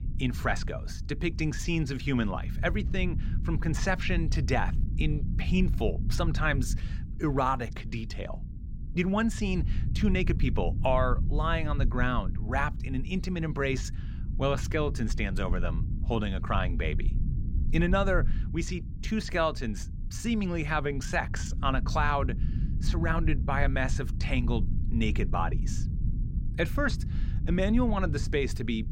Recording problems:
low rumble; noticeable; throughout; 15 dB below the speech

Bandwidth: 16 kHz